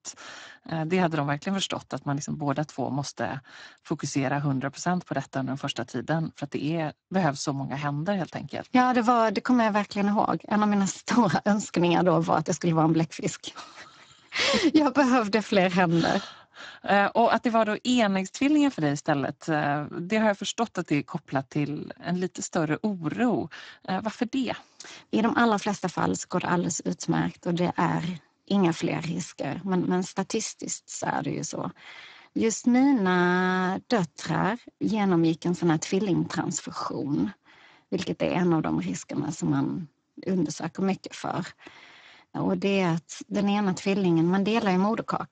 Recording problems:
garbled, watery; badly; nothing above 7.5 kHz

